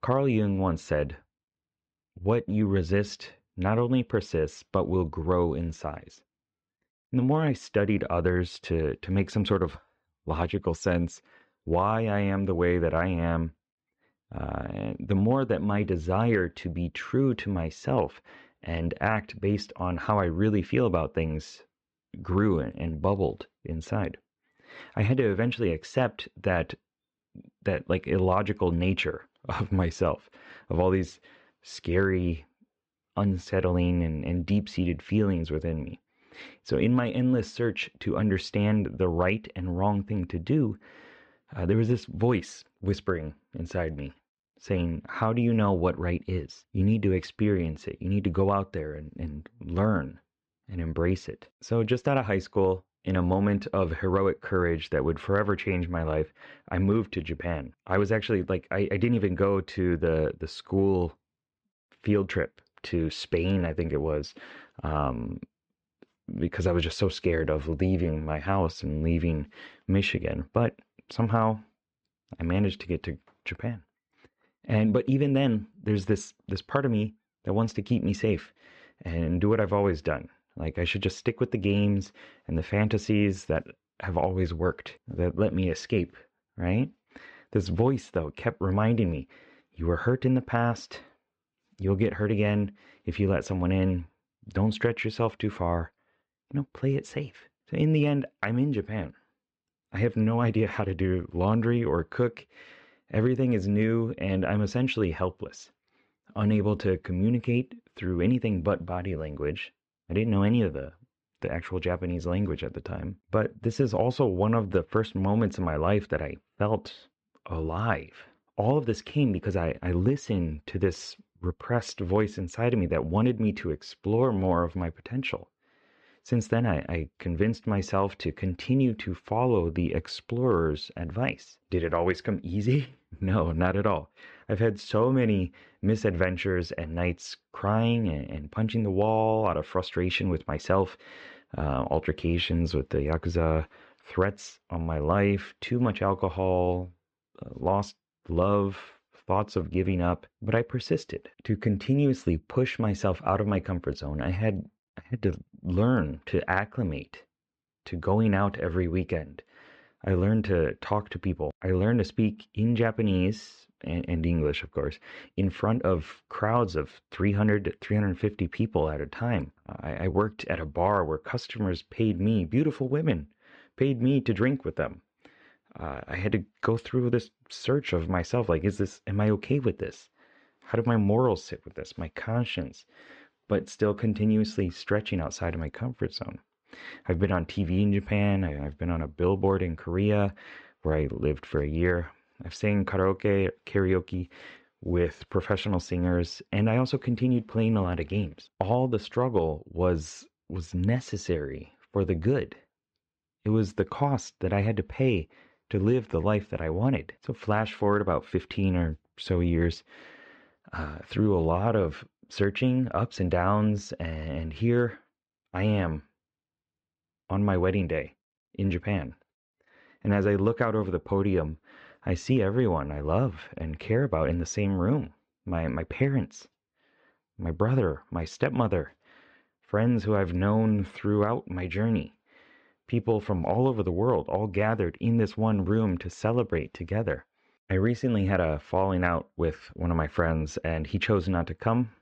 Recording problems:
muffled; slightly; fading above 4 kHz

